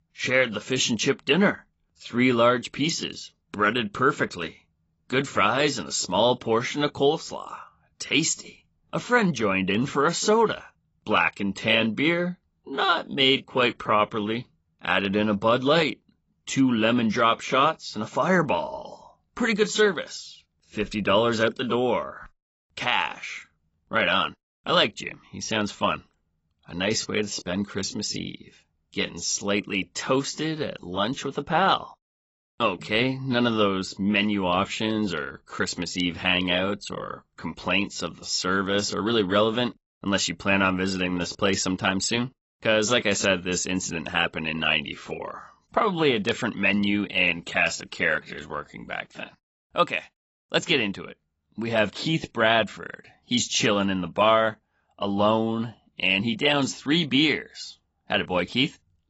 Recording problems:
garbled, watery; badly; nothing above 7.5 kHz

